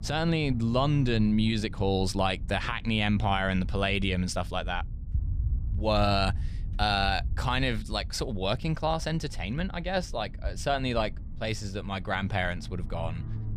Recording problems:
low rumble; faint; throughout; 25 dB below the speech

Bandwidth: 14.5 kHz